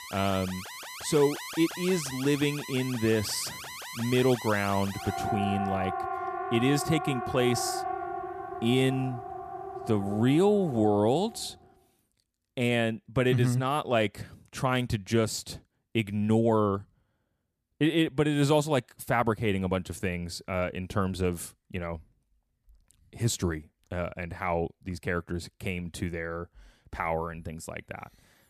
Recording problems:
alarms or sirens; loud; until 11 s; 8 dB below the speech

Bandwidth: 14.5 kHz